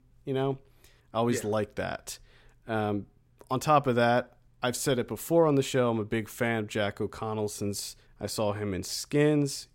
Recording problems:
none

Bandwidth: 16 kHz